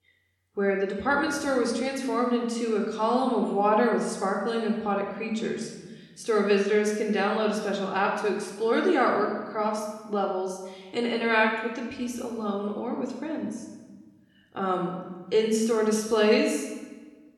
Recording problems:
room echo; noticeable; dies away in 1.2 s
off-mic speech; somewhat distant

